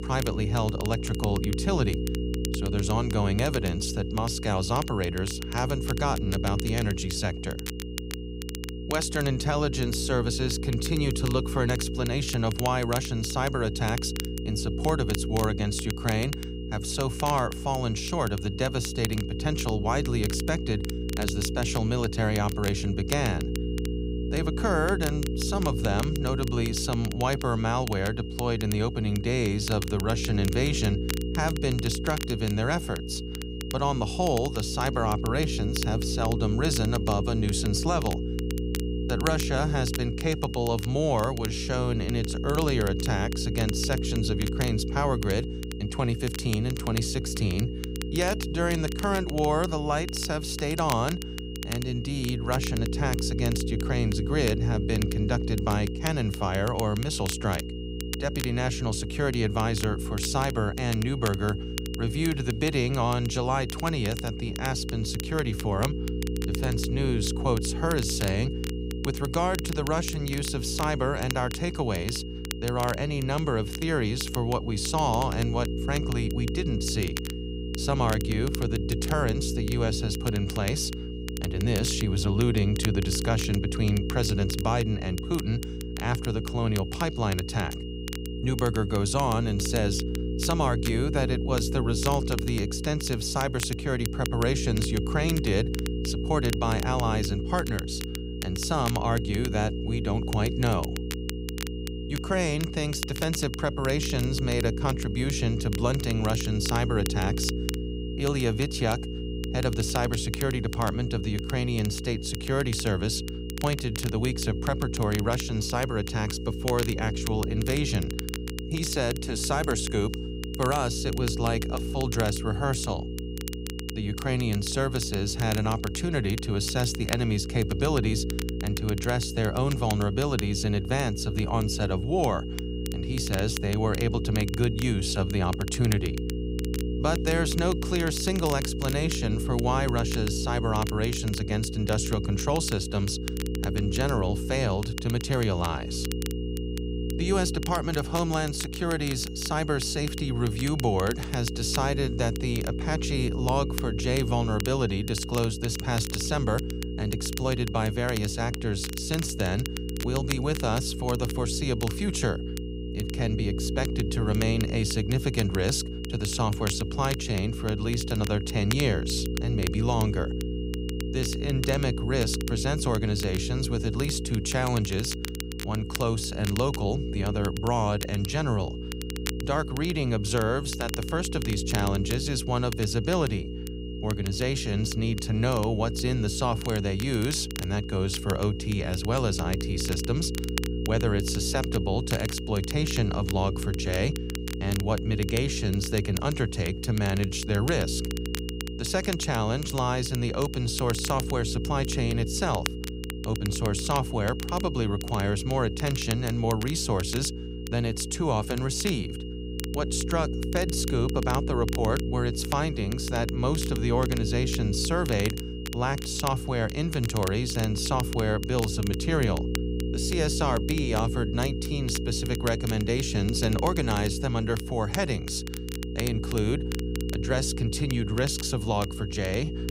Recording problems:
electrical hum; loud; throughout; 60 Hz, 9 dB below the speech
high-pitched whine; noticeable; throughout; 3 kHz, 20 dB below the speech
crackle, like an old record; noticeable; 10 dB below the speech

